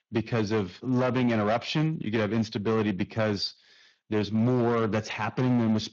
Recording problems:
distortion; slight; 11% of the sound clipped
garbled, watery; slightly; nothing above 6.5 kHz

